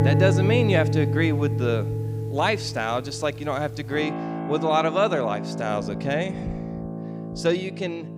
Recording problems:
background music; loud; throughout; 3 dB below the speech

